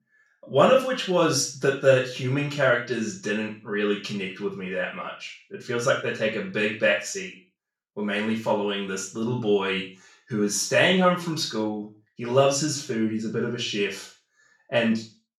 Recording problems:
off-mic speech; far
room echo; noticeable; dies away in 0.3 s

